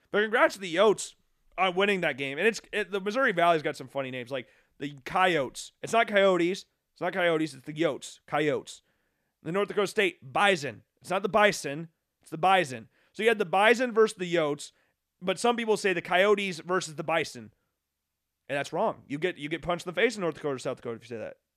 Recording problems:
none

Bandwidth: 14 kHz